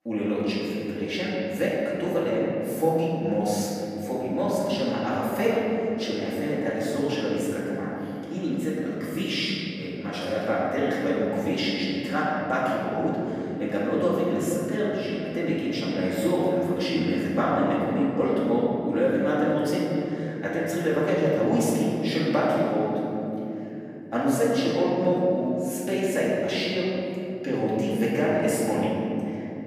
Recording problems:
room echo; strong; dies away in 3 s
off-mic speech; far

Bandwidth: 15 kHz